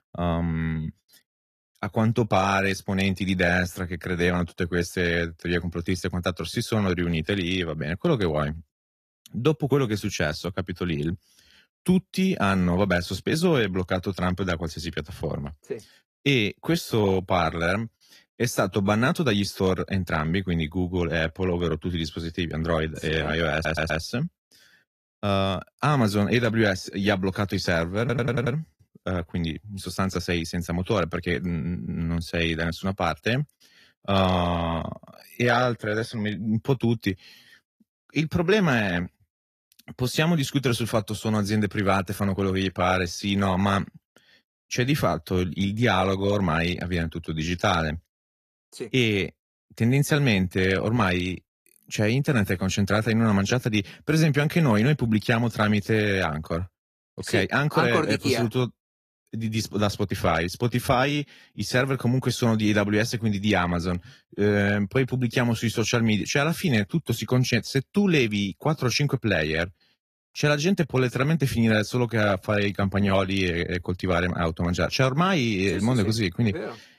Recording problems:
garbled, watery; slightly; nothing above 14.5 kHz
audio stuttering; at 24 s and at 28 s

